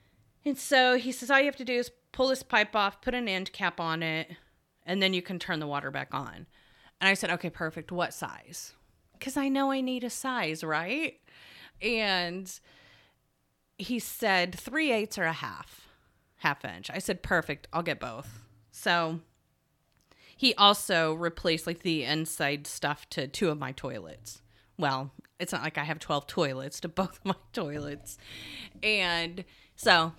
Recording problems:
none

